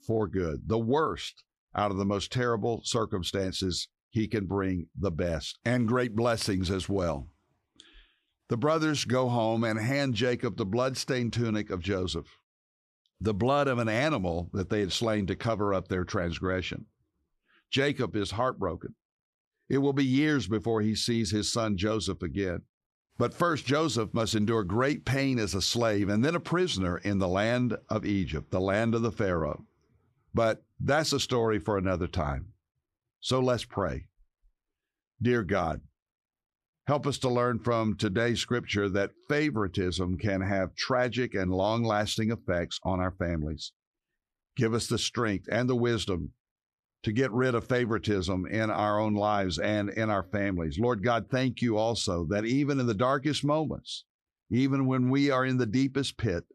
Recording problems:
squashed, flat; somewhat

